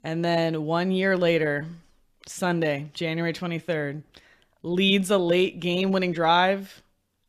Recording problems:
none

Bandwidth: 14.5 kHz